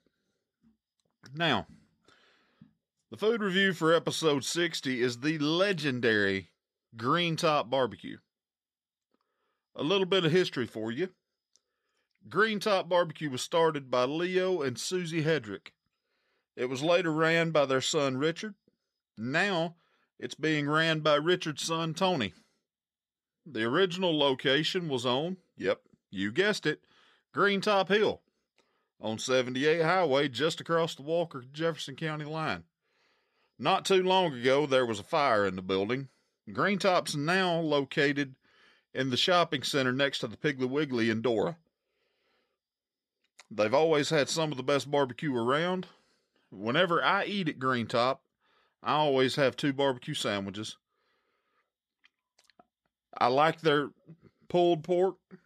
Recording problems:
none

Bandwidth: 13.5 kHz